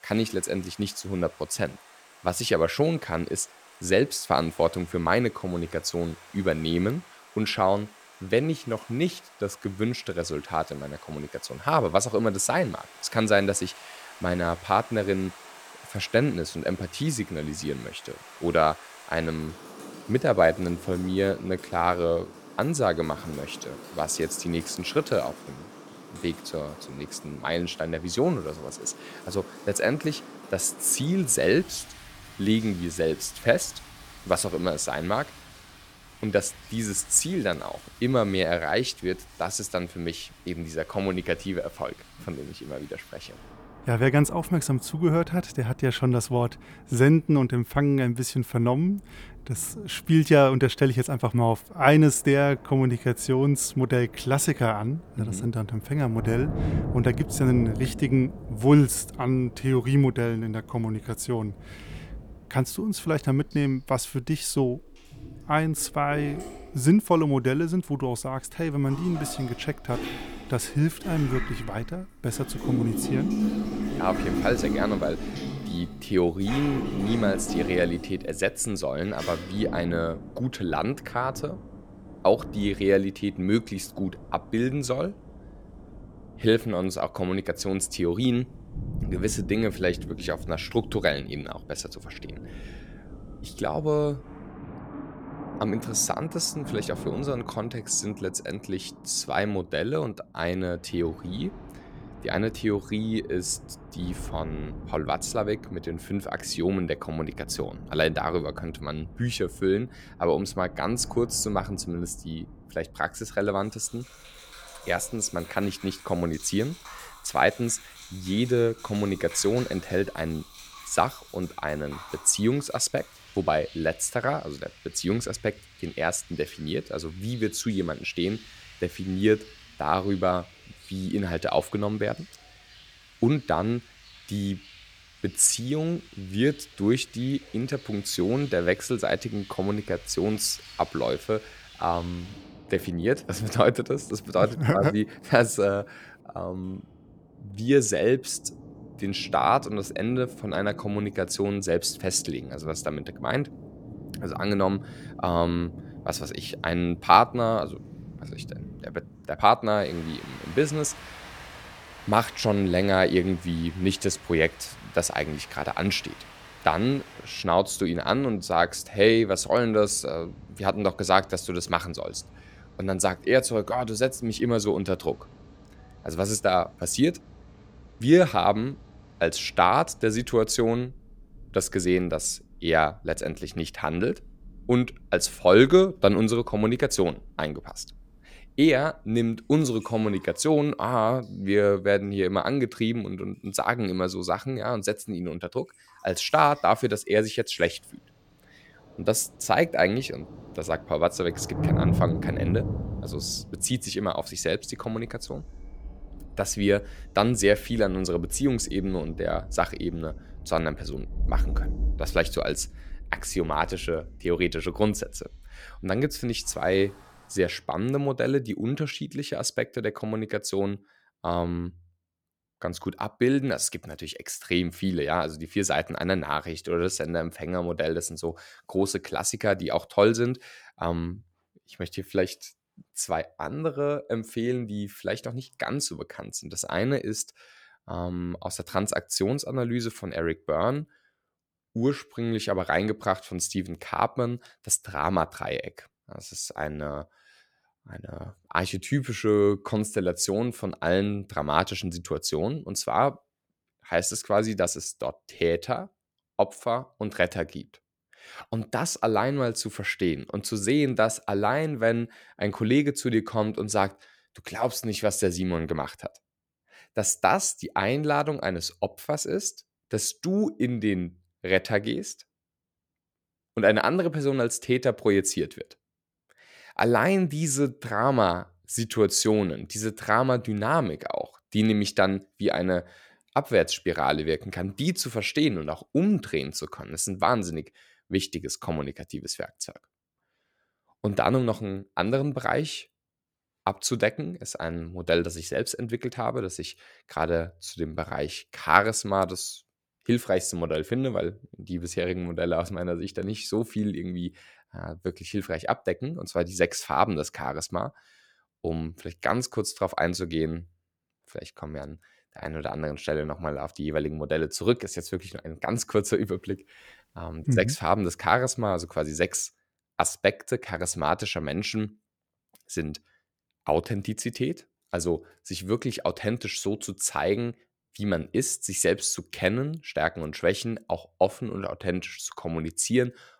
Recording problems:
rain or running water; noticeable; until 3:37; 15 dB below the speech

